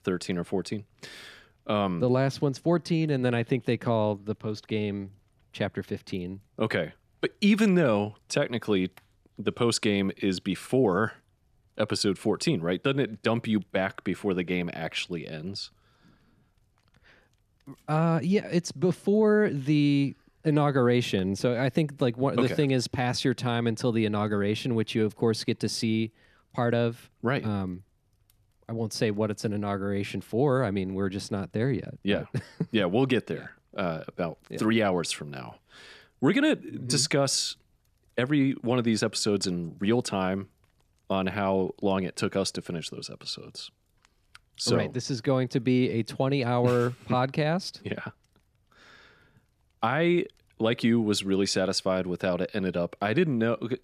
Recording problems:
none

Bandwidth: 14.5 kHz